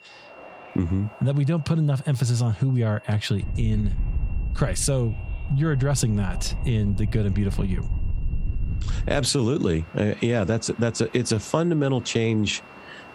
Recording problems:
squashed, flat; somewhat
wind noise on the microphone; occasional gusts; from 3.5 to 9 s; 20 dB below the speech
high-pitched whine; faint; throughout; 2.5 kHz, 30 dB below the speech
train or aircraft noise; faint; throughout; 25 dB below the speech

